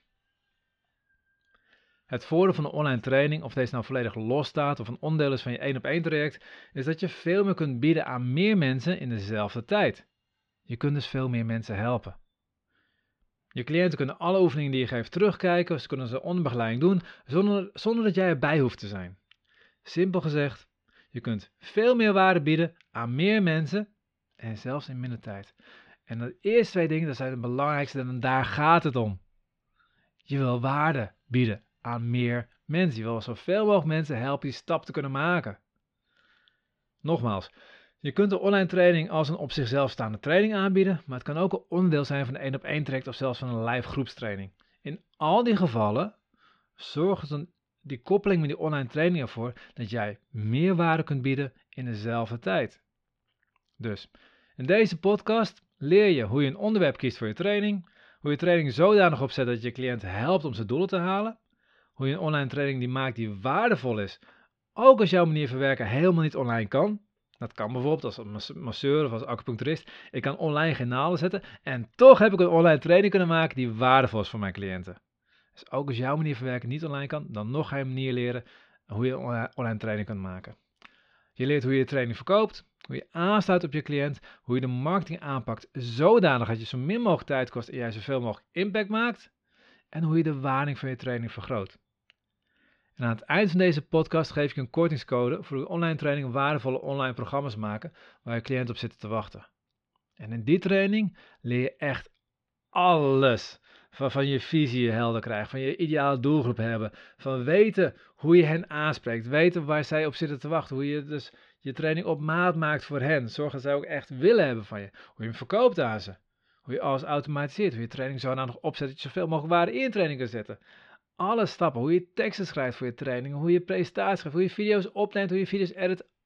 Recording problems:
muffled; slightly; fading above 4 kHz

